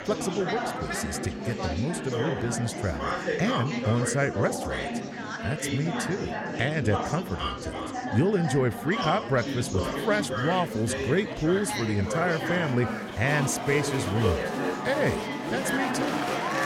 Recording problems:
chatter from many people; loud; throughout; 2 dB below the speech

